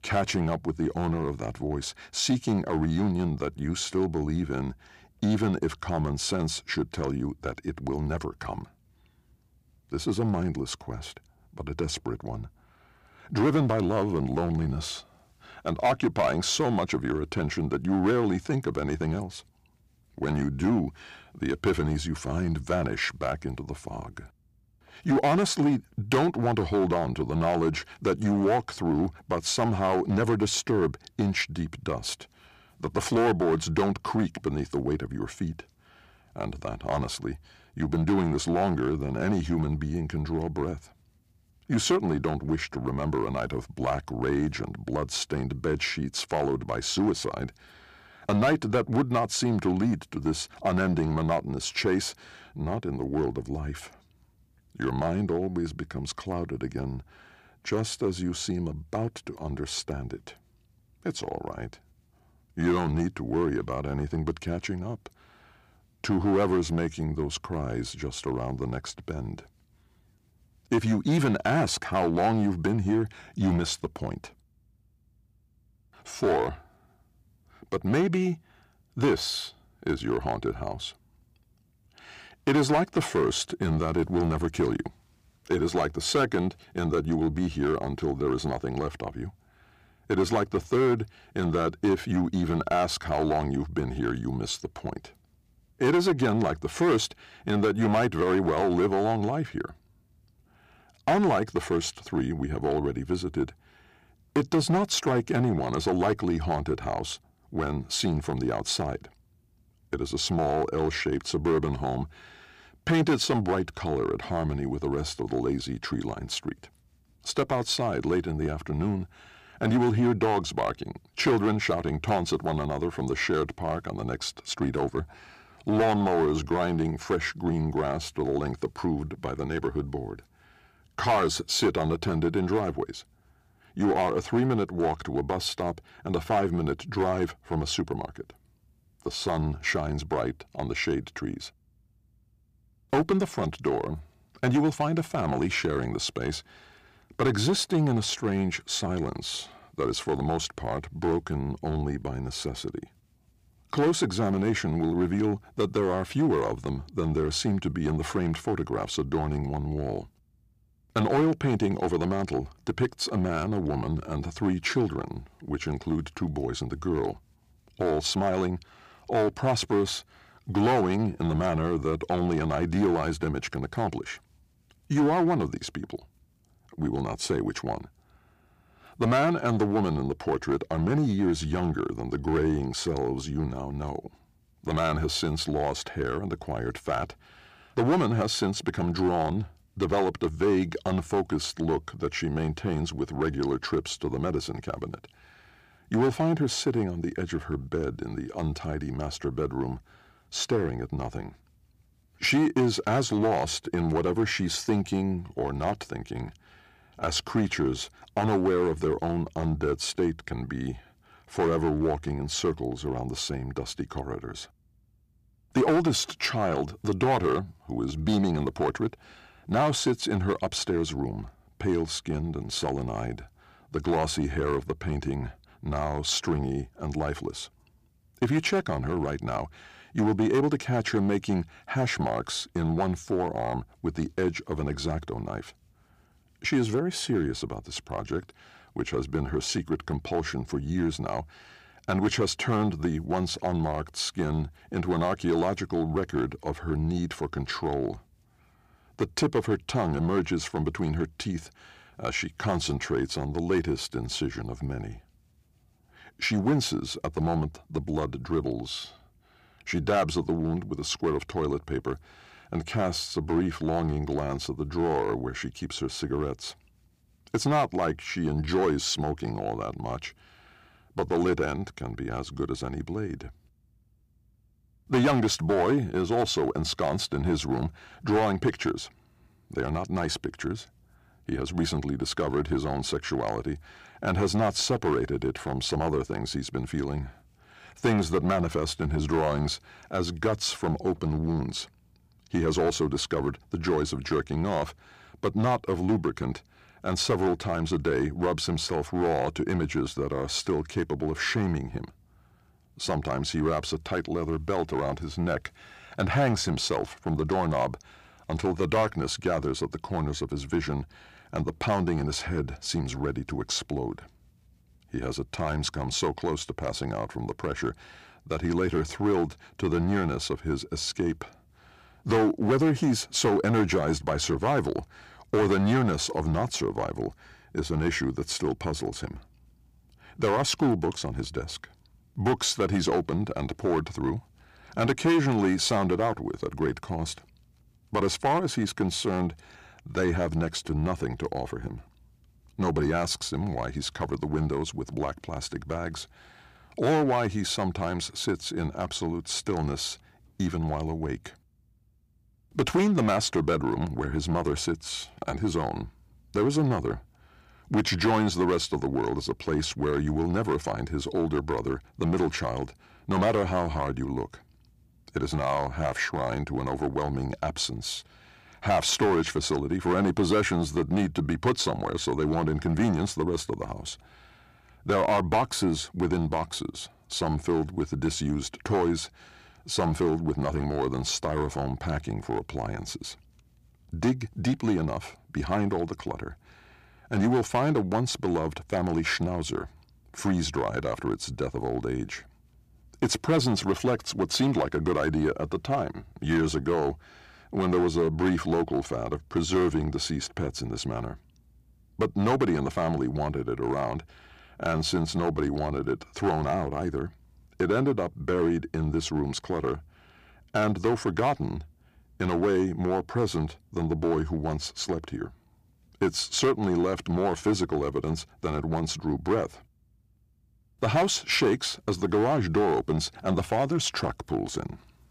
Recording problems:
distortion; slight; 4% of the sound clipped

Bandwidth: 15 kHz